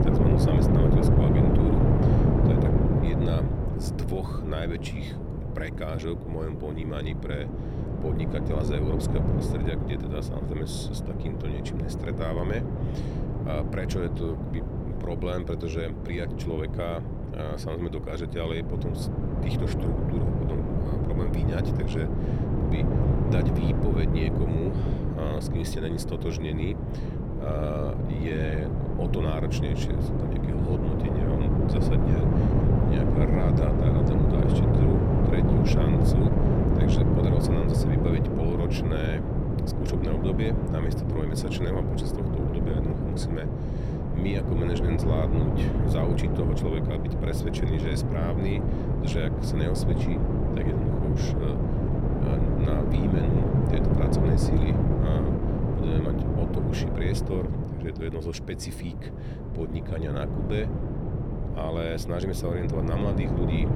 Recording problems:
wind noise on the microphone; heavy; 2 dB above the speech

